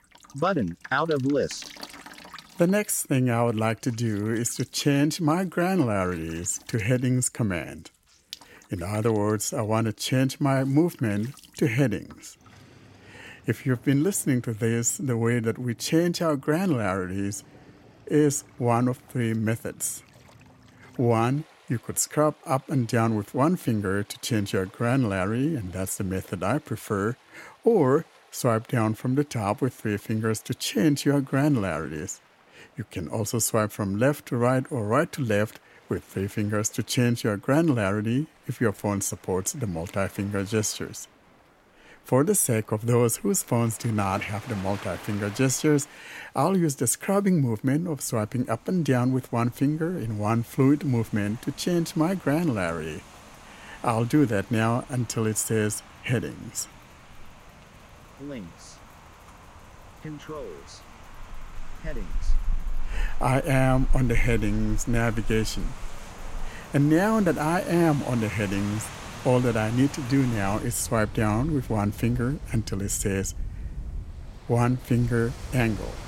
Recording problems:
rain or running water; noticeable; throughout; 15 dB below the speech

